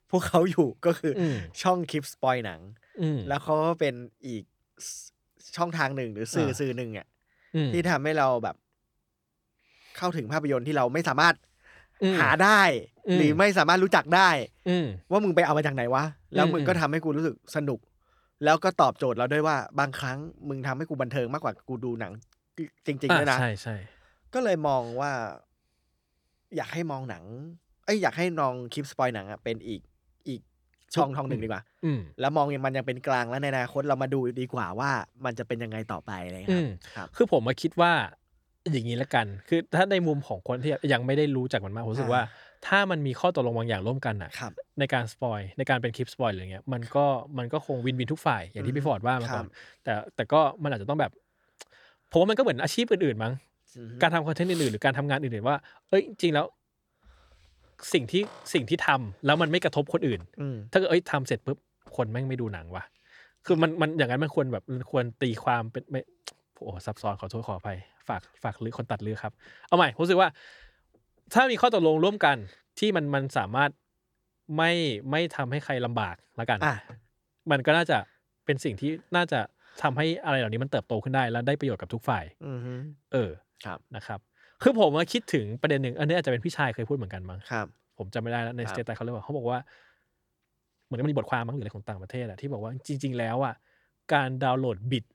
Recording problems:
uneven, jittery; strongly; from 3 s to 1:32

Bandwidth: 18.5 kHz